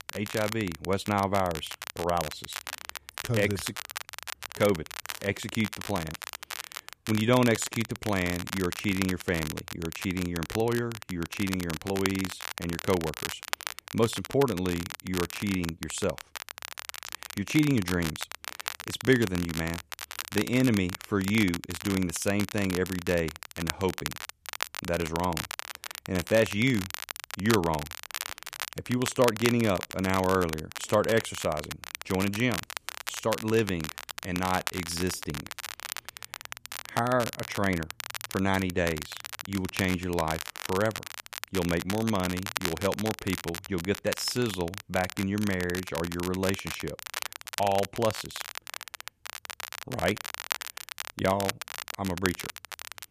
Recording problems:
crackle, like an old record; loud; 8 dB below the speech

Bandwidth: 14.5 kHz